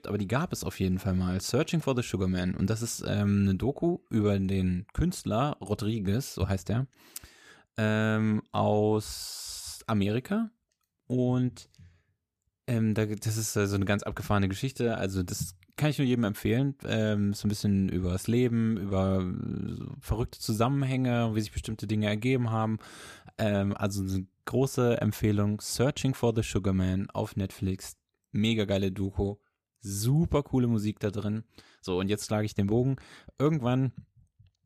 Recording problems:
none

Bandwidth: 14.5 kHz